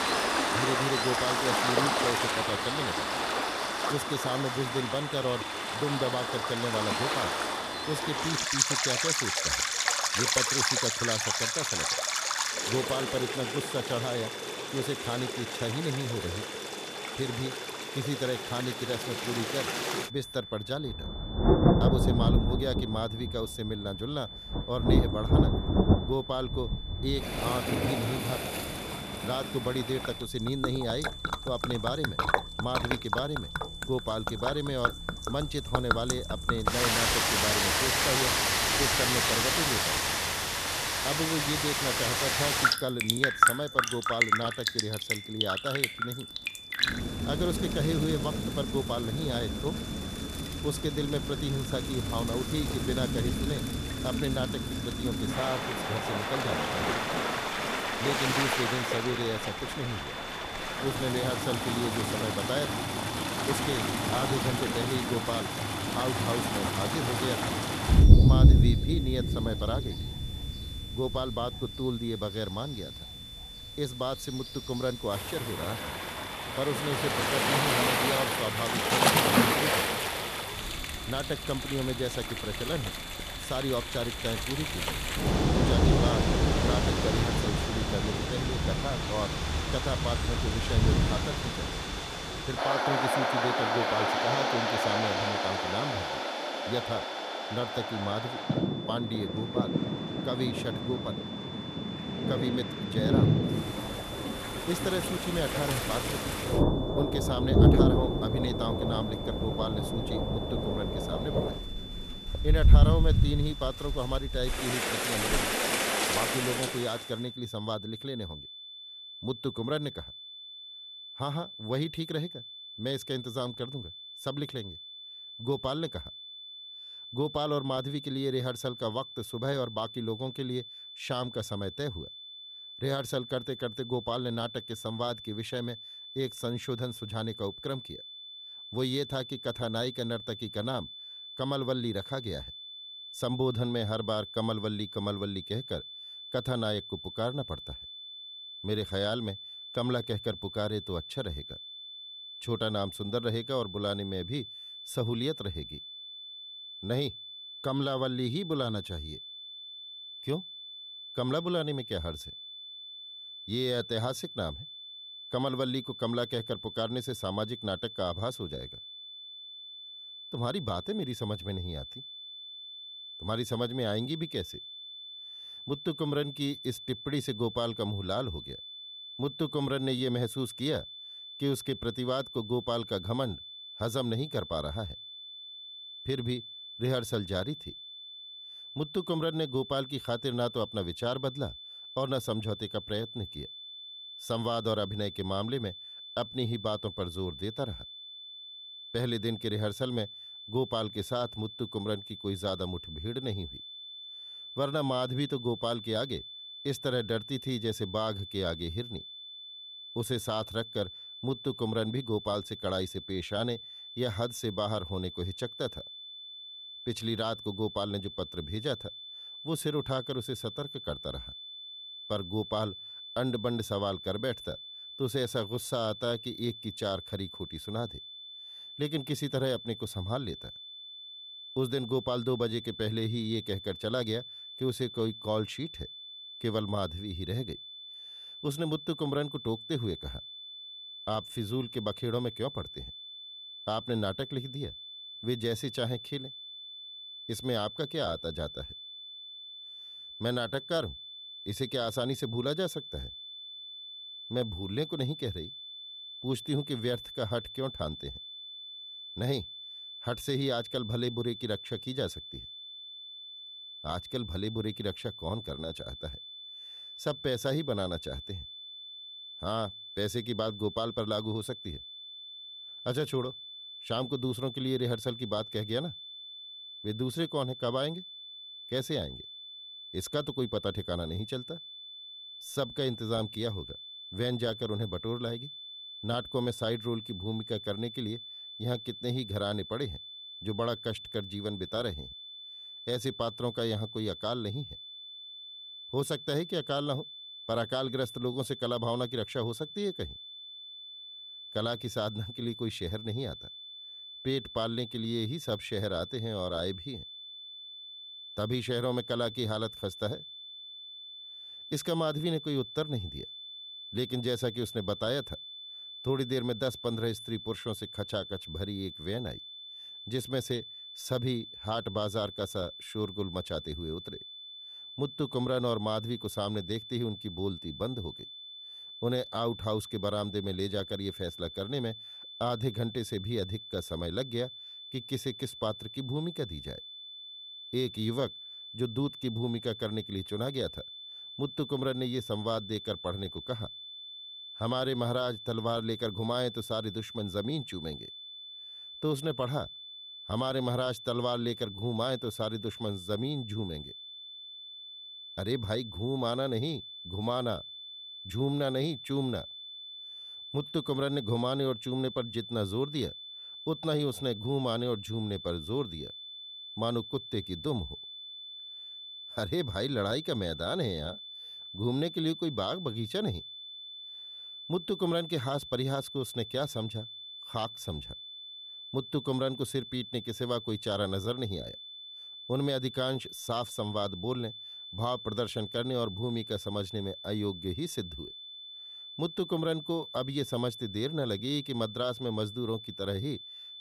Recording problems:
rain or running water; very loud; until 1:57; 5 dB above the speech
high-pitched whine; loud; throughout; 3.5 kHz, 8 dB below the speech

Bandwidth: 14.5 kHz